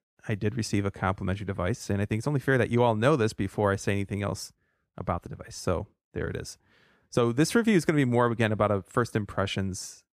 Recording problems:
uneven, jittery; slightly; from 1 to 9.5 s

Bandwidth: 14.5 kHz